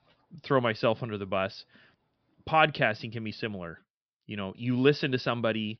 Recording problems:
high frequencies cut off; noticeable; nothing above 5.5 kHz

